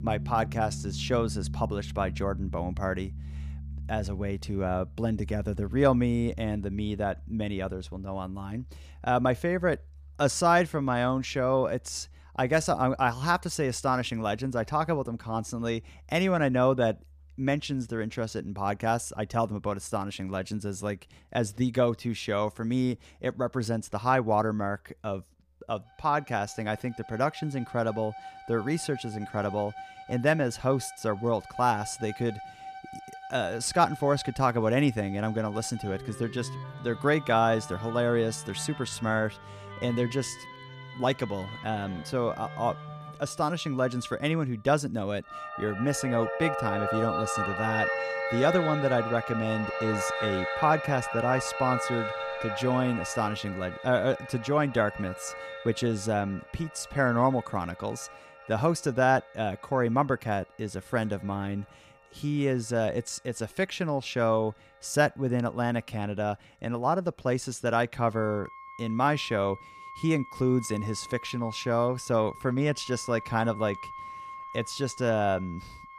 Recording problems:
background music; loud; throughout; 9 dB below the speech

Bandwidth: 15 kHz